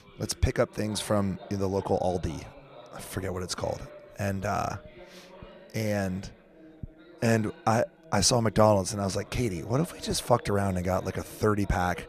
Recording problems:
background chatter; faint; throughout; 4 voices, 20 dB below the speech

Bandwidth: 14.5 kHz